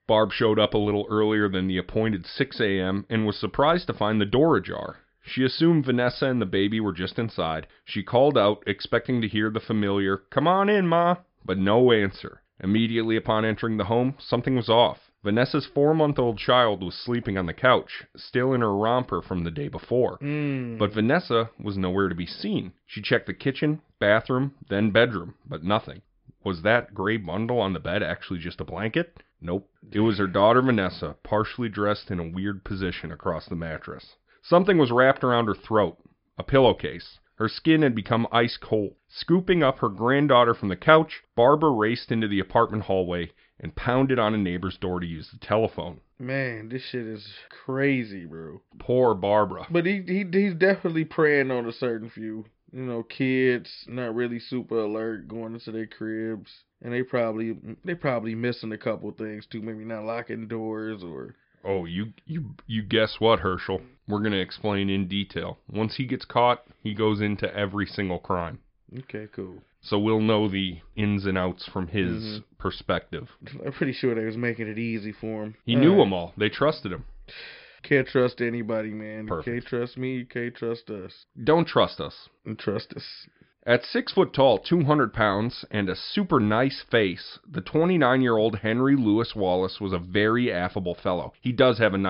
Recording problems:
high frequencies cut off; noticeable; nothing above 5.5 kHz
abrupt cut into speech; at the end

